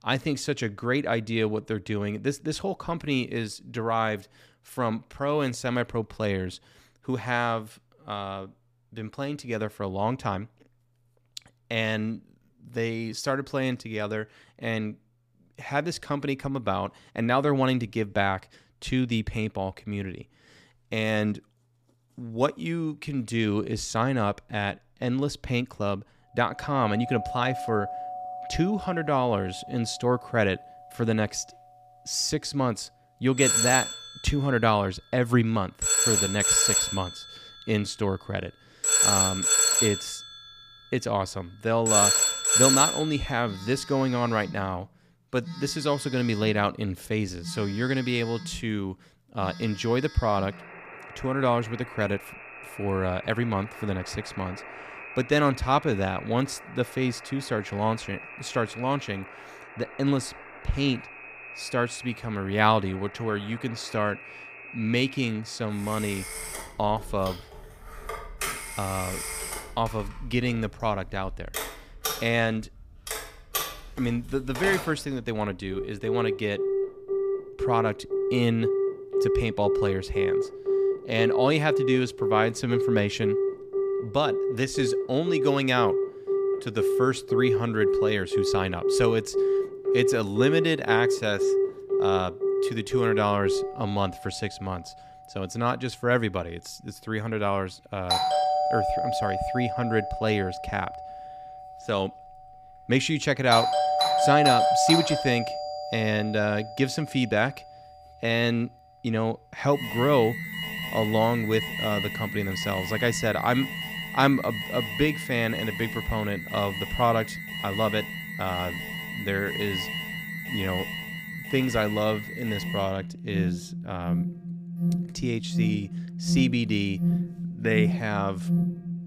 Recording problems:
alarms or sirens; very loud; from 27 s on; 1 dB above the speech

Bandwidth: 15 kHz